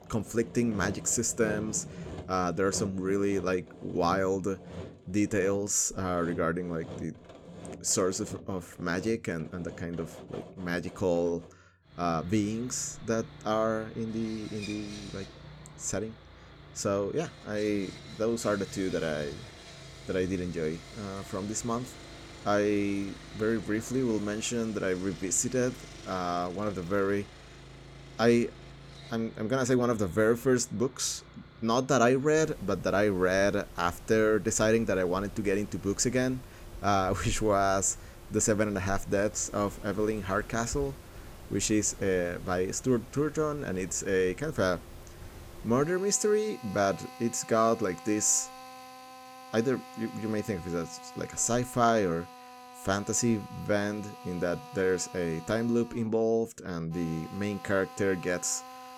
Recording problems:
machinery noise; noticeable; throughout; 15 dB below the speech

